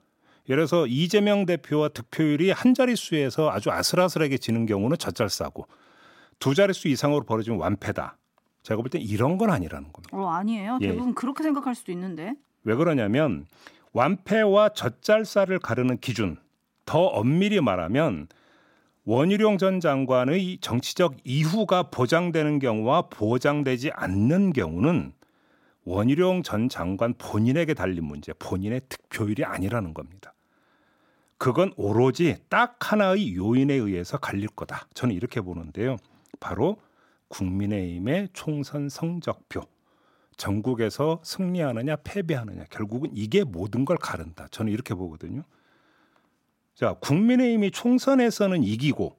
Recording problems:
none

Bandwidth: 16 kHz